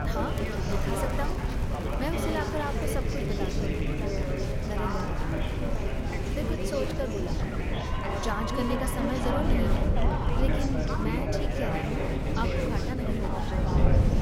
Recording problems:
chatter from many people; very loud; throughout; 2 dB above the speech
wind noise on the microphone; heavy; 5 dB below the speech

